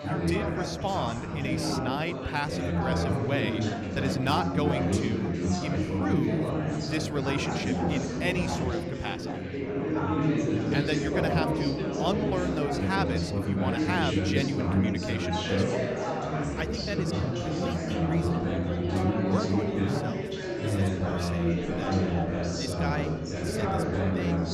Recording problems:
chatter from many people; very loud; throughout; 5 dB above the speech

